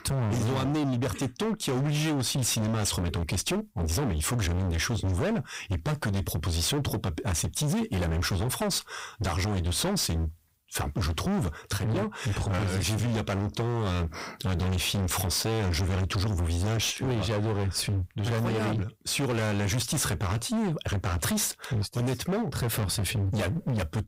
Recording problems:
distortion; heavy; 39% of the sound clipped

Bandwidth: 15.5 kHz